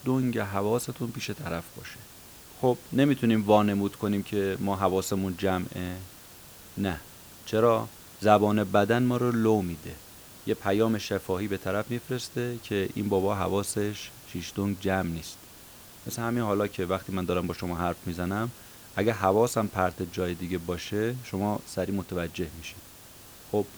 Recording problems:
hiss; noticeable; throughout; 20 dB below the speech

